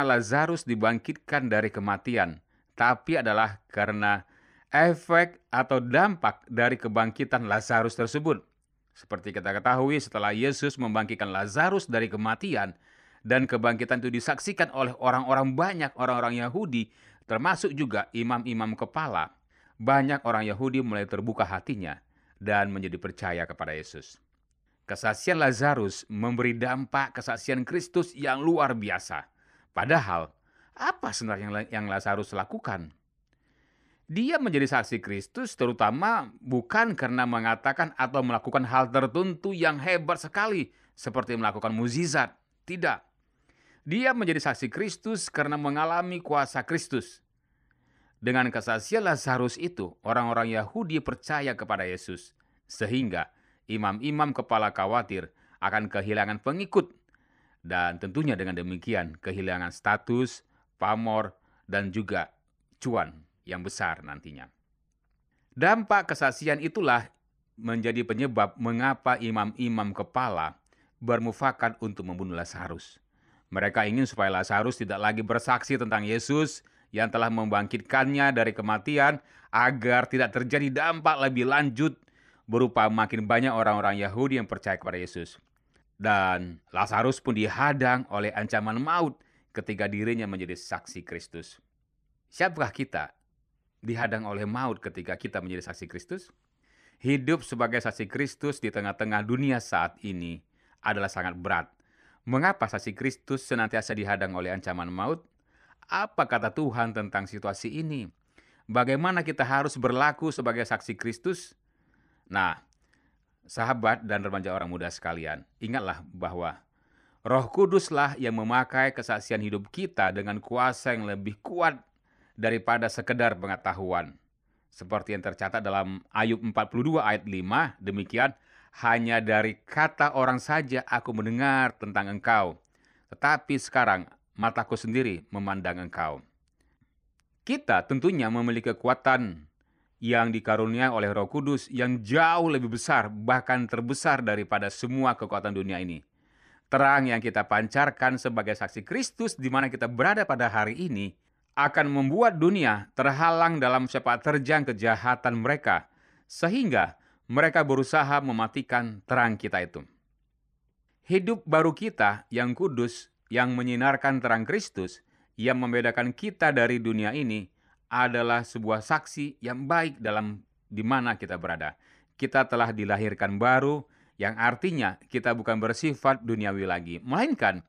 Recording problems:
abrupt cut into speech; at the start

